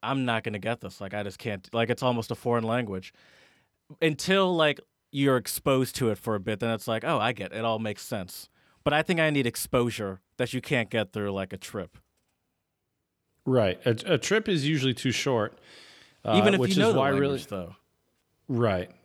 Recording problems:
none

